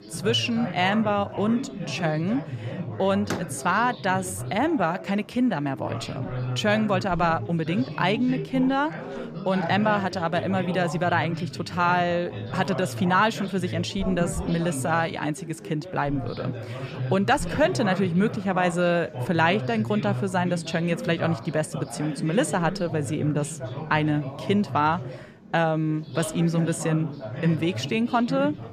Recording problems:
background chatter; loud; throughout; 4 voices, 9 dB below the speech
door banging; noticeable; at 3.5 s; peak 8 dB below the speech

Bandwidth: 14.5 kHz